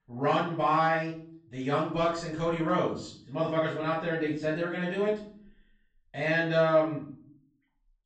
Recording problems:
off-mic speech; far
room echo; noticeable; dies away in 0.5 s
high frequencies cut off; noticeable; nothing above 8 kHz

